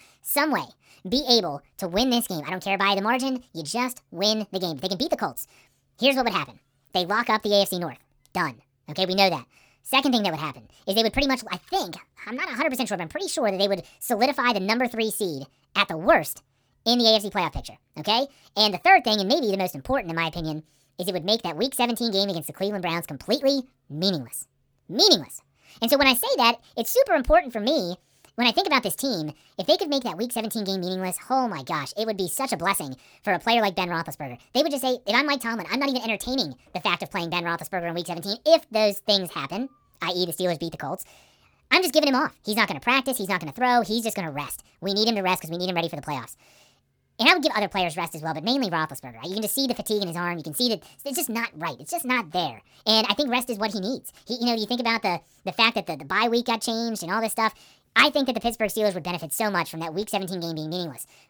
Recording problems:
wrong speed and pitch; too fast and too high; 1.5 times normal speed

